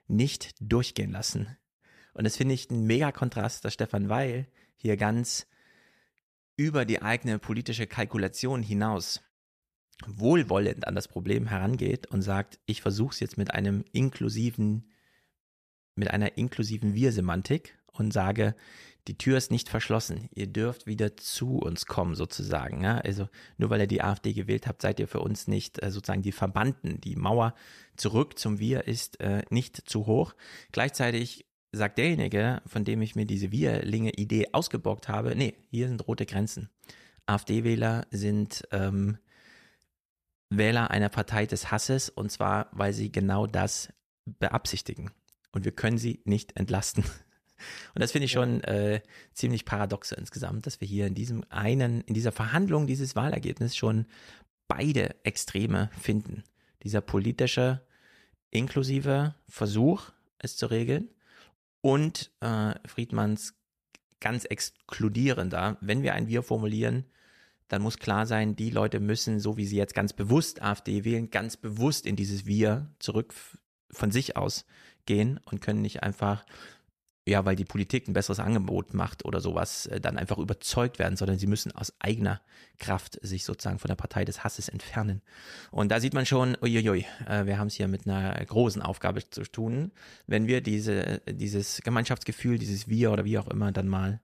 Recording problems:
none

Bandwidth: 14.5 kHz